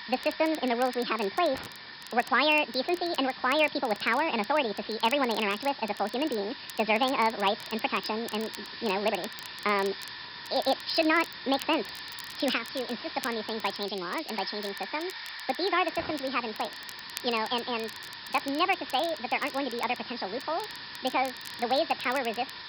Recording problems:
wrong speed and pitch; too fast and too high; 1.7 times normal speed
high frequencies cut off; noticeable; nothing above 5.5 kHz
hiss; noticeable; throughout; 10 dB below the speech
crackle, like an old record; noticeable; 20 dB below the speech

